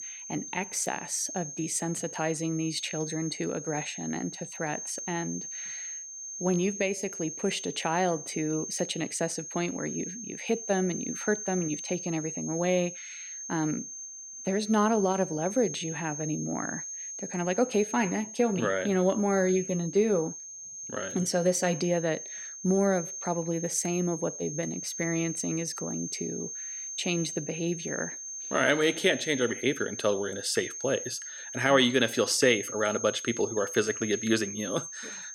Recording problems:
high-pitched whine; loud; throughout; 6.5 kHz, 8 dB below the speech

